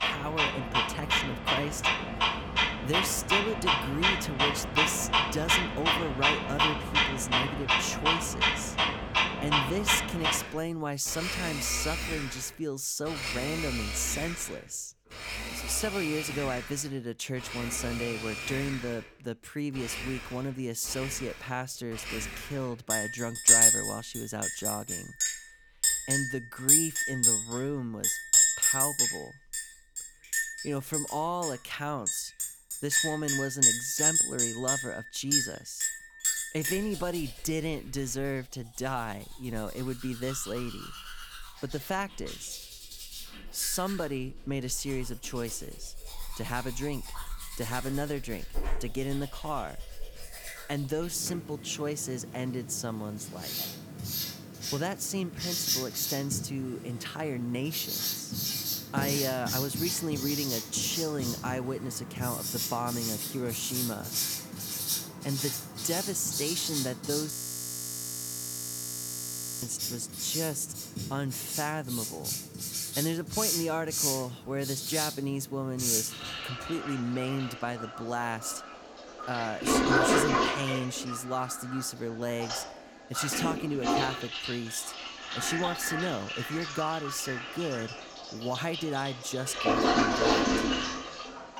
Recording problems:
household noises; very loud; throughout; 5 dB above the speech
audio freezing; at 1:07 for 2.5 s

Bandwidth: 18.5 kHz